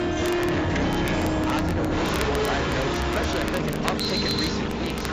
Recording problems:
distortion; heavy; 41% of the sound clipped
garbled, watery; badly; nothing above 7.5 kHz
animal sounds; very loud; throughout; 3 dB above the speech
background music; very loud; throughout; 3 dB above the speech
crackle, like an old record; loud; 10 dB below the speech
keyboard typing; noticeable; at 1 s; peak 6 dB below the speech
alarm; loud; at 4 s; peak 5 dB above the speech

